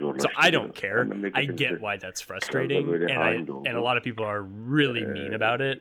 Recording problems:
voice in the background; loud; throughout; 5 dB below the speech

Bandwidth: 18.5 kHz